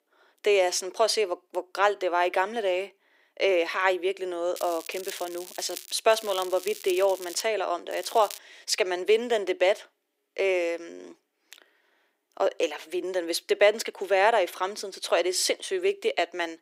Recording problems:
thin; very; fading below 350 Hz
crackling; noticeable; from 4.5 to 6 s, from 6 to 7.5 s and at 8 s; 15 dB below the speech

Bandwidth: 15.5 kHz